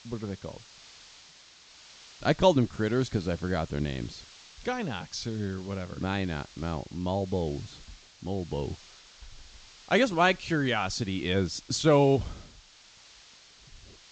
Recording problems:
high frequencies cut off; noticeable; nothing above 8 kHz
hiss; faint; throughout; 20 dB below the speech

